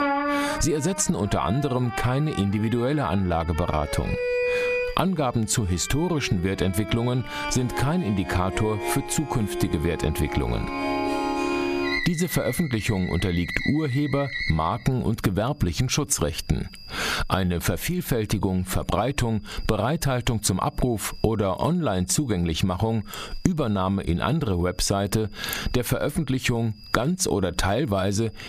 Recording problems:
squashed, flat; somewhat, background pumping
background music; loud; until 15 s; 5 dB below the speech
high-pitched whine; faint; throughout; 5 kHz, 25 dB below the speech

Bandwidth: 14.5 kHz